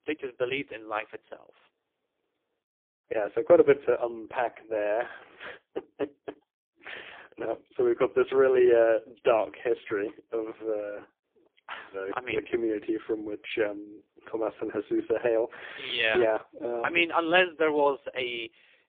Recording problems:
phone-call audio; poor line; nothing above 3.5 kHz

